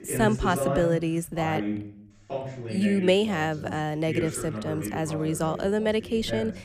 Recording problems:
voice in the background; loud; throughout; 7 dB below the speech

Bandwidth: 15 kHz